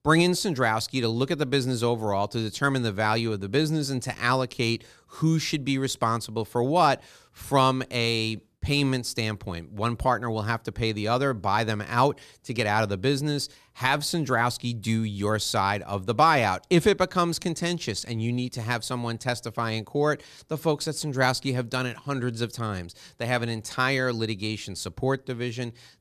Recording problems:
none

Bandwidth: 14 kHz